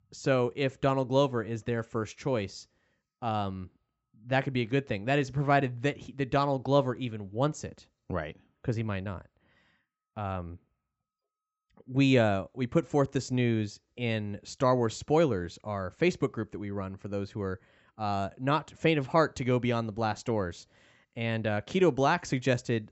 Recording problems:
high frequencies cut off; noticeable; nothing above 8 kHz

